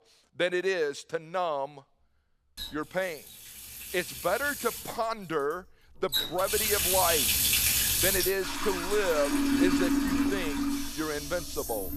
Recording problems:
household noises; very loud; throughout; 4 dB above the speech

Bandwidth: 14.5 kHz